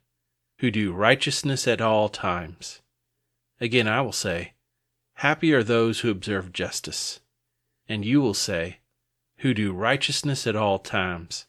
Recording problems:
none

